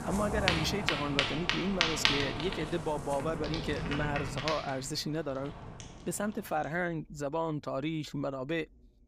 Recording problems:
rain or running water; very loud; throughout; 2 dB above the speech

